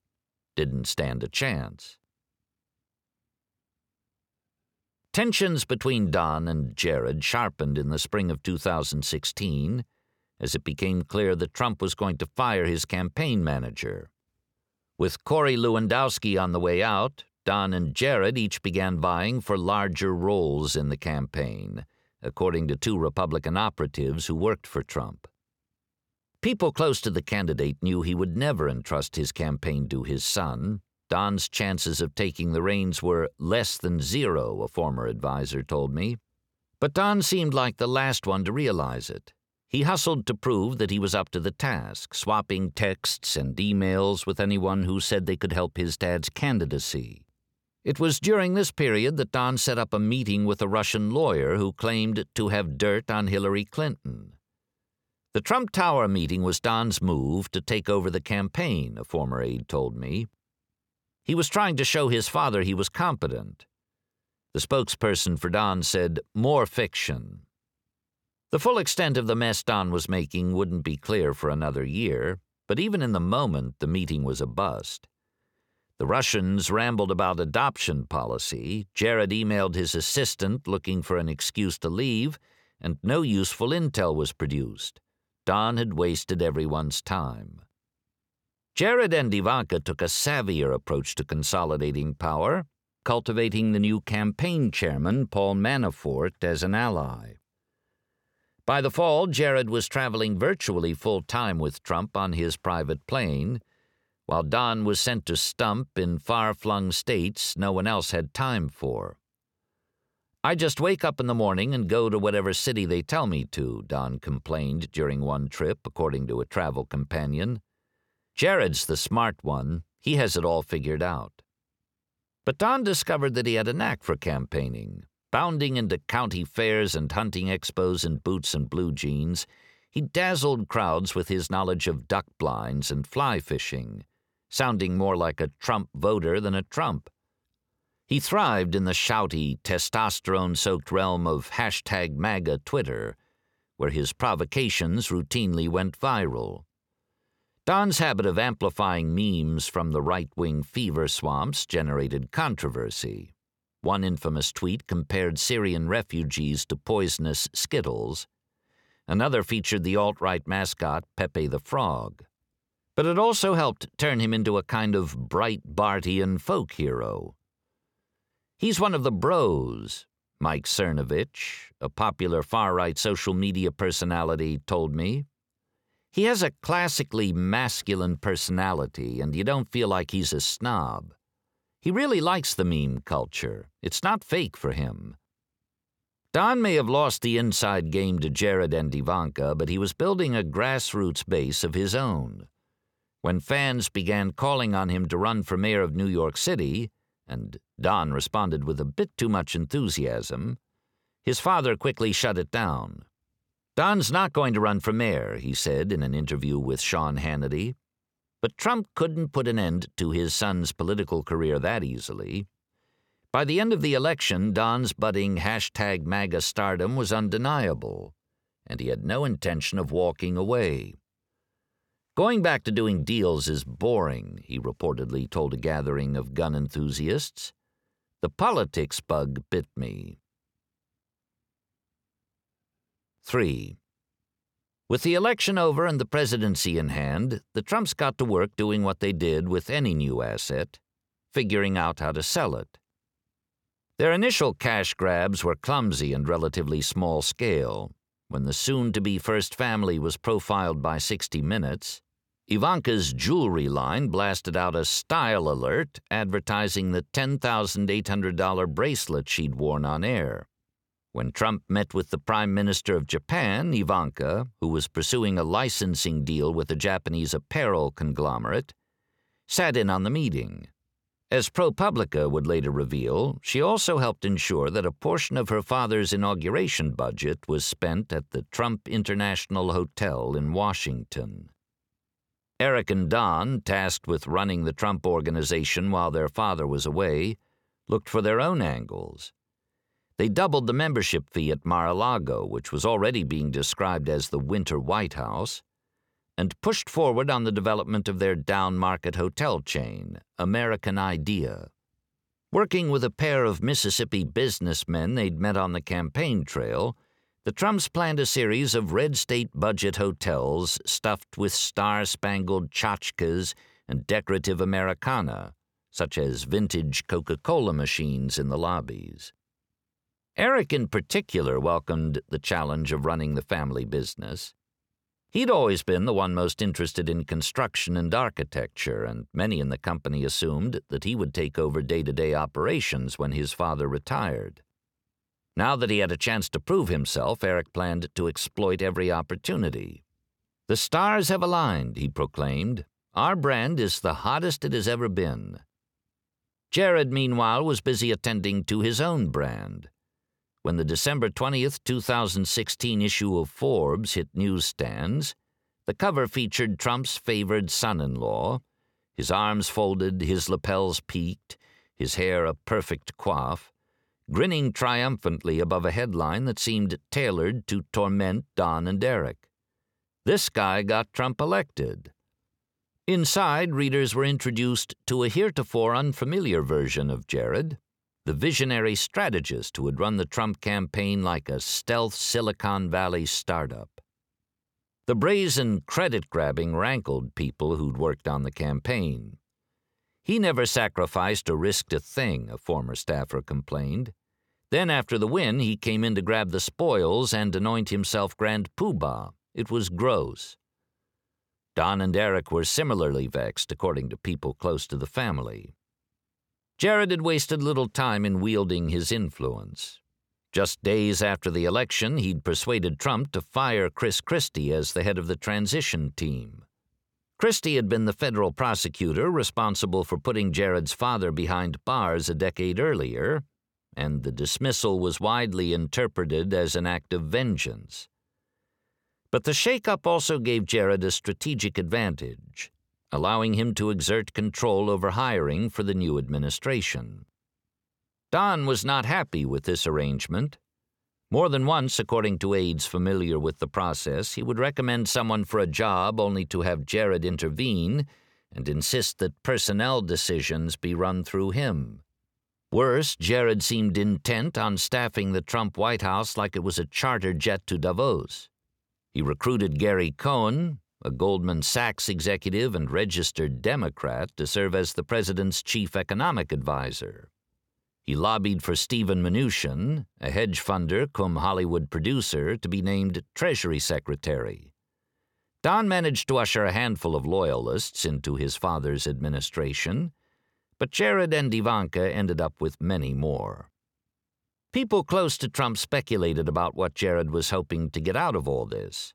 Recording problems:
none

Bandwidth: 17 kHz